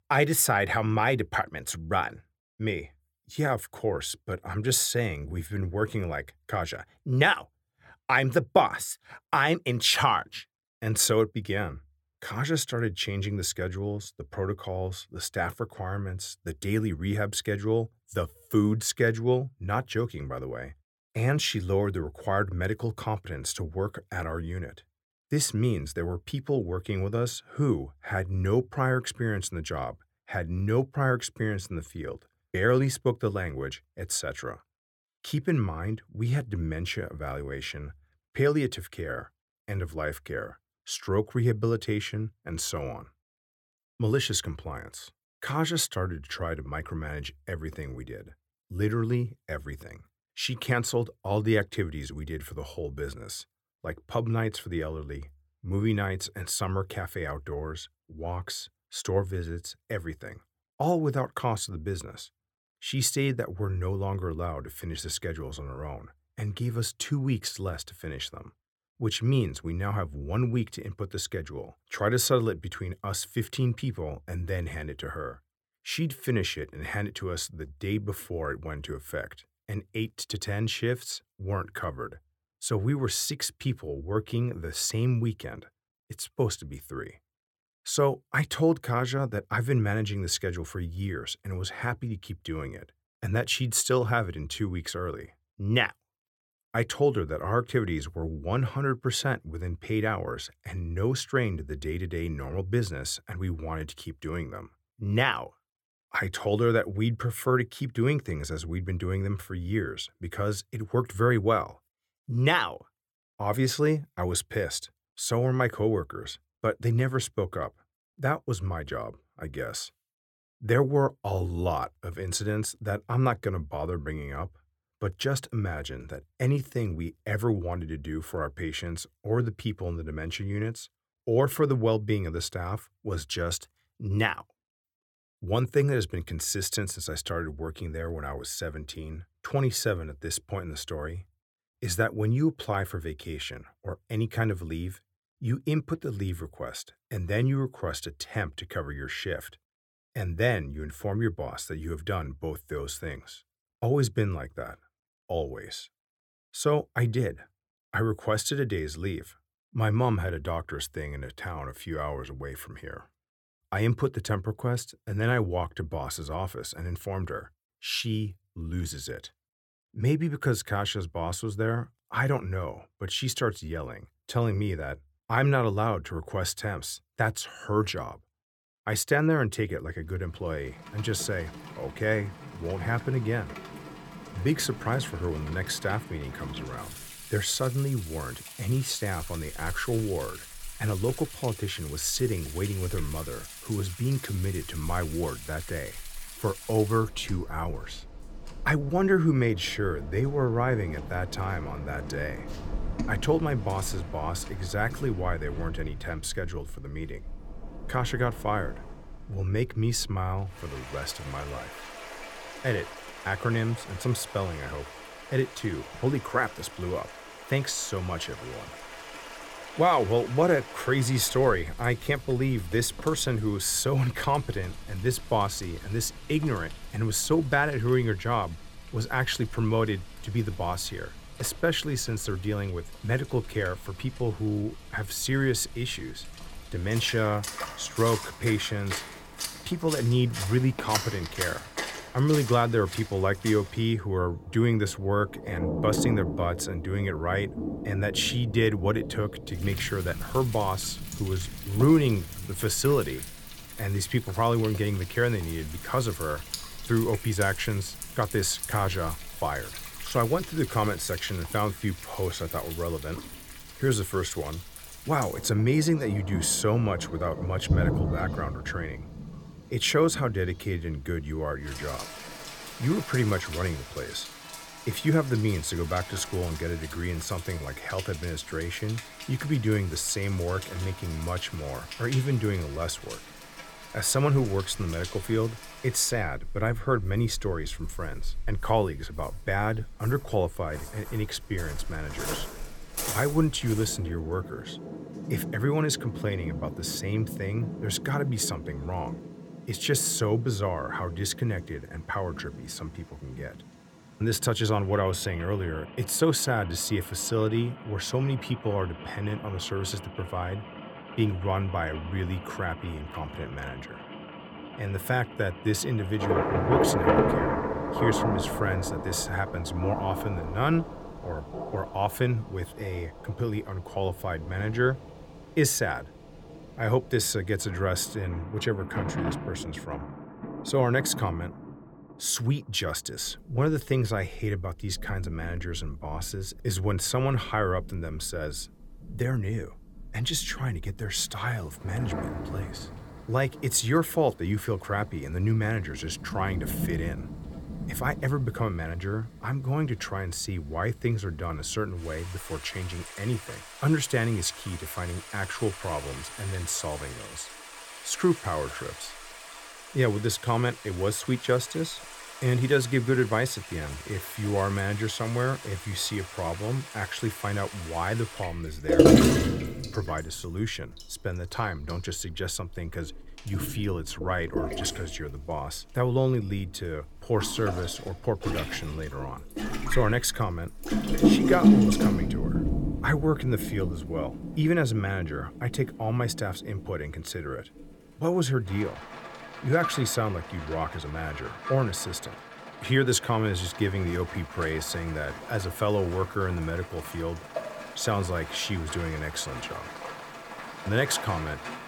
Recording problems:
rain or running water; loud; from 3:01 on; 6 dB below the speech

